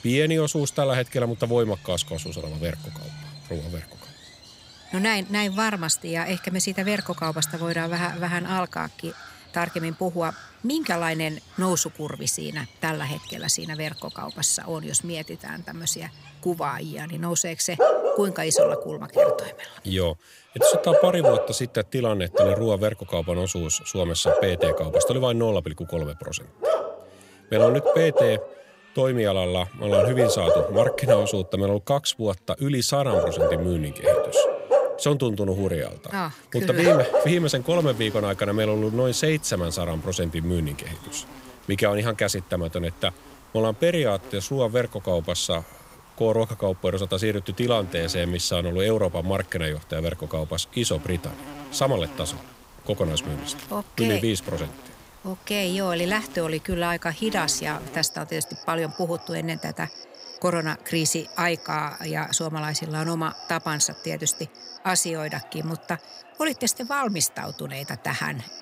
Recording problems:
animal sounds; loud; throughout; as loud as the speech

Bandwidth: 15.5 kHz